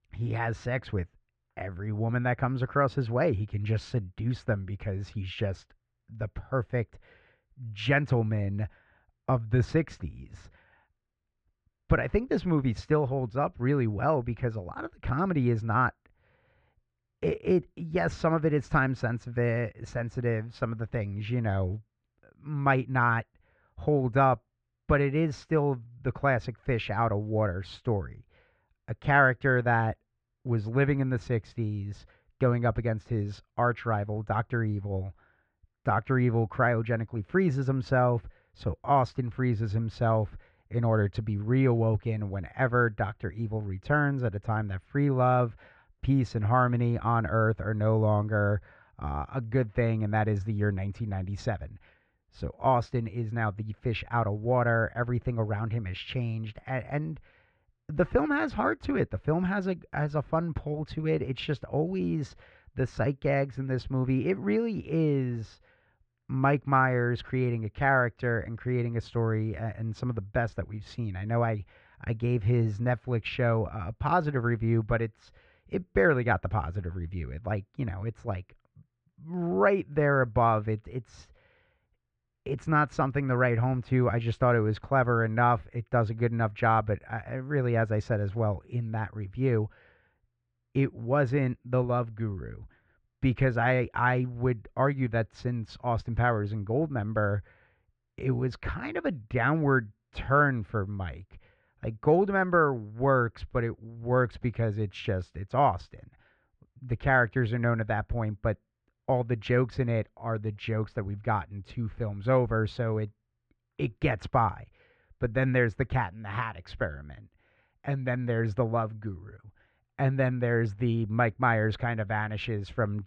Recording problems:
muffled; very; fading above 2.5 kHz

